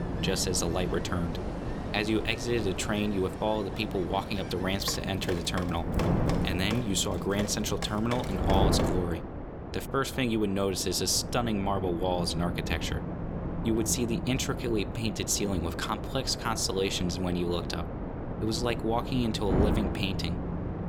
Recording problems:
wind noise on the microphone; heavy; 7 dB below the speech
rain or running water; noticeable; until 9 s; 10 dB below the speech

